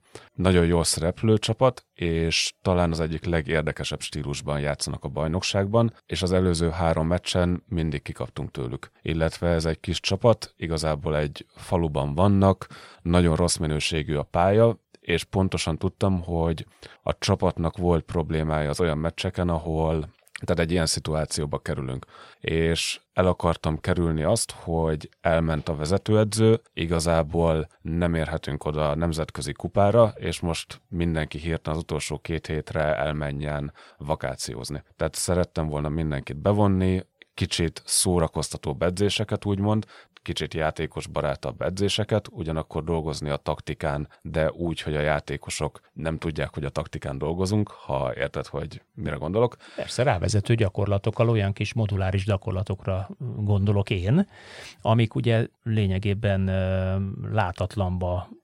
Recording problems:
none

